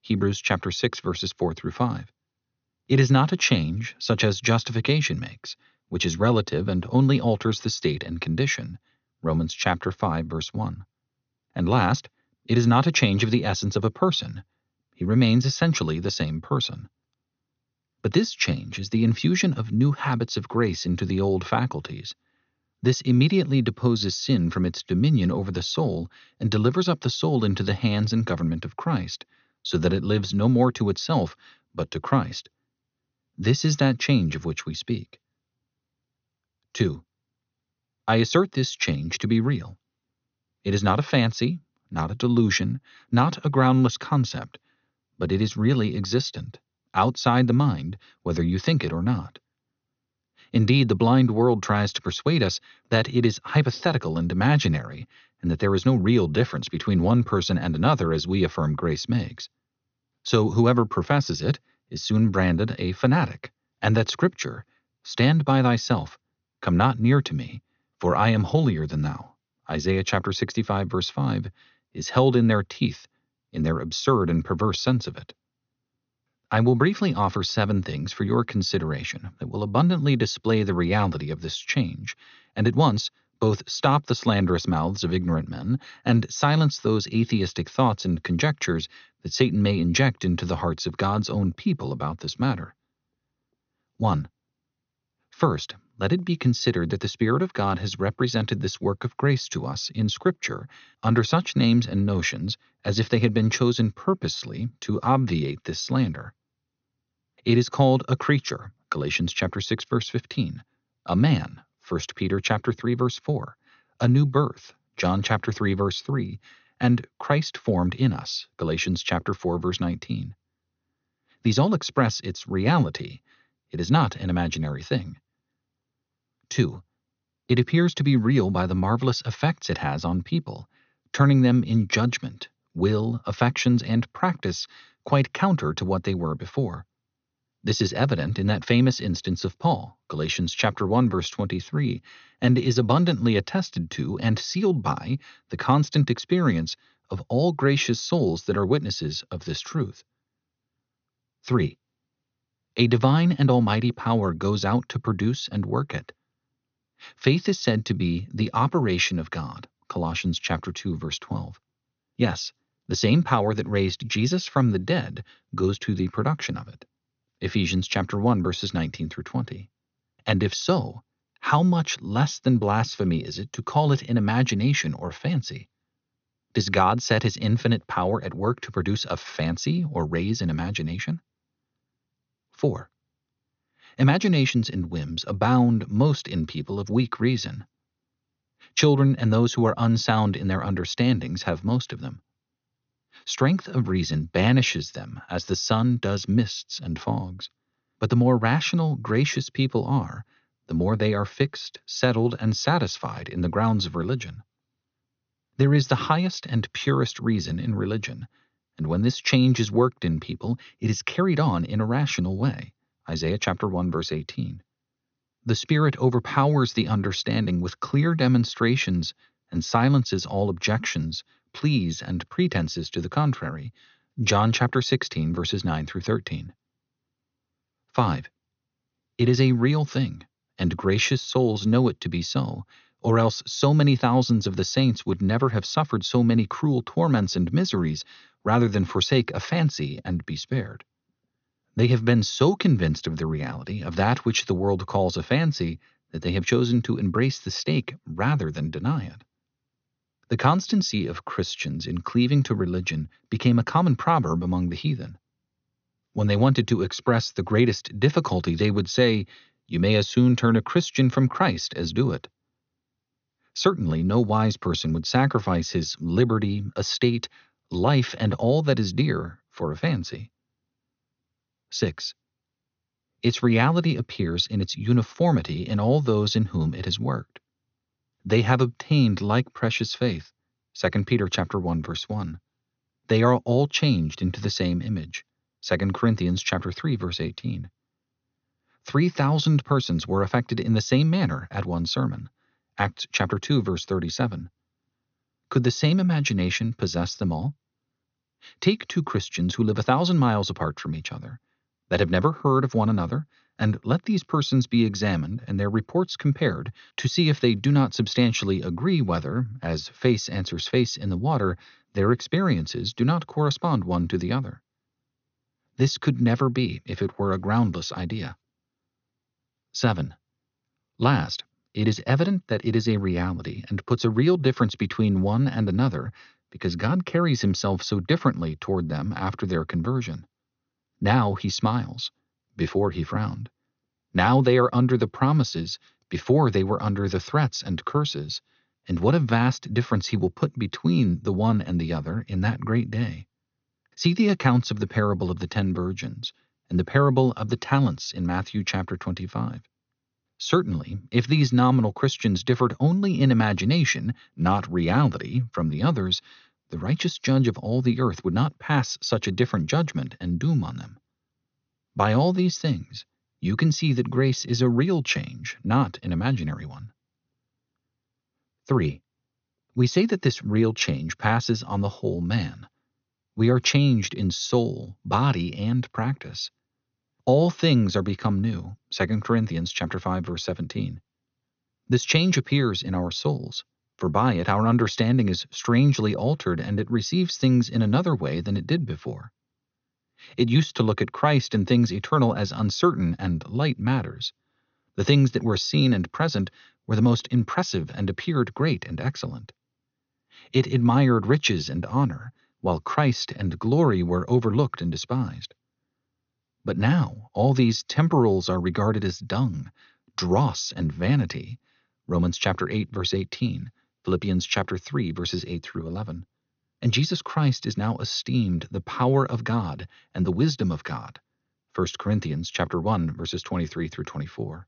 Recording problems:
high frequencies cut off; noticeable; nothing above 6.5 kHz

